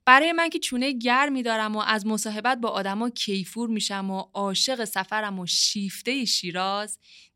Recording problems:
none

